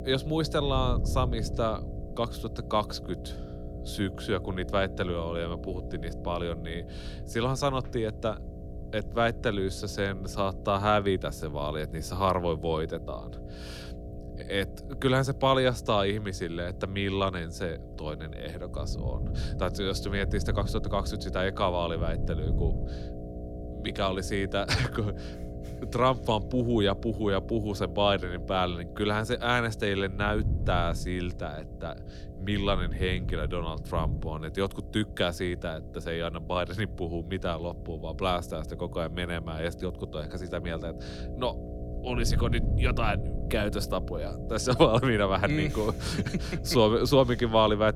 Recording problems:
electrical hum; noticeable; throughout; 60 Hz, 15 dB below the speech
wind noise on the microphone; occasional gusts; 25 dB below the speech

